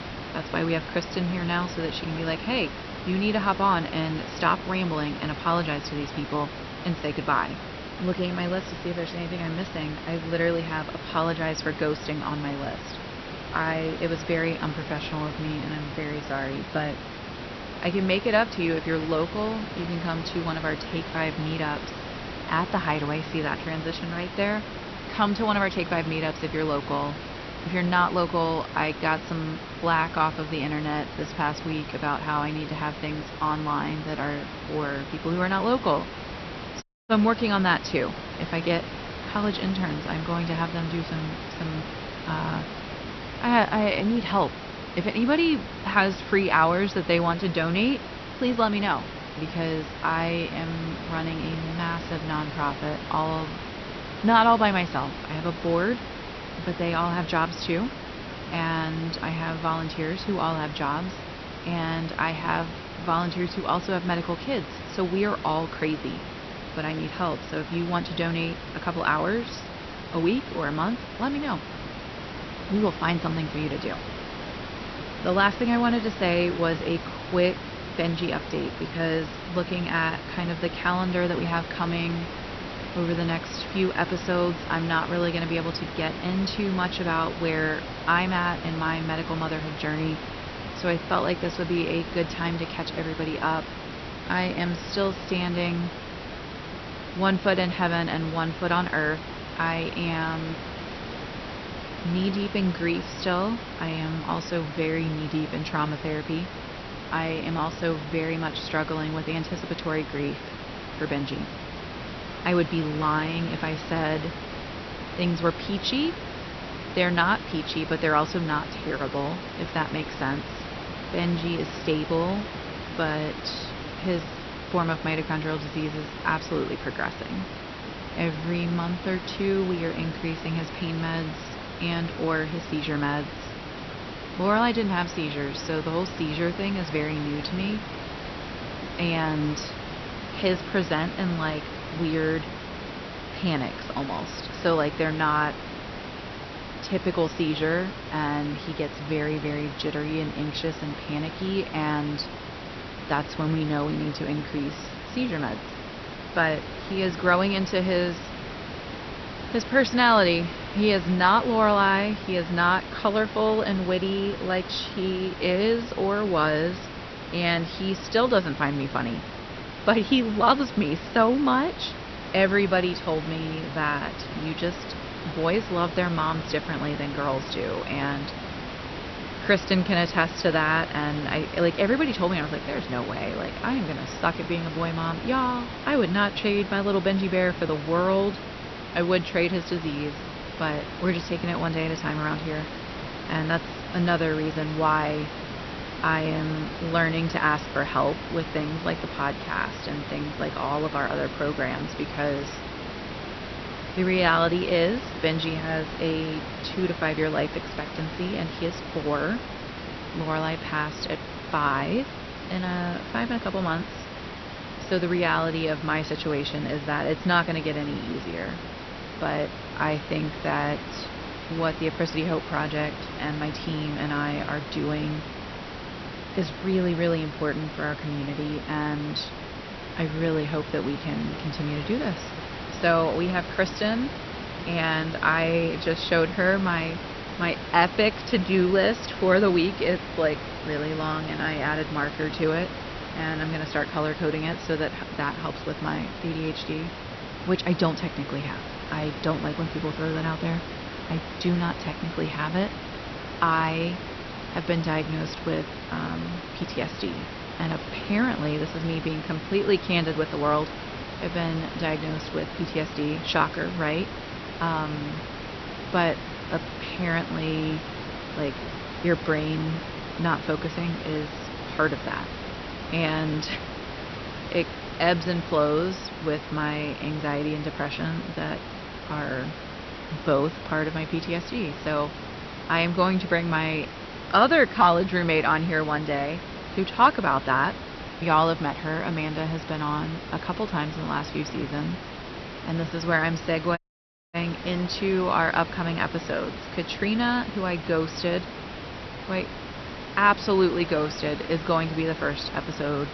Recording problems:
high frequencies cut off; noticeable; nothing above 6 kHz
garbled, watery; slightly
hiss; loud; throughout; 9 dB below the speech
audio cutting out; at 37 s and at 4:54 for 0.5 s

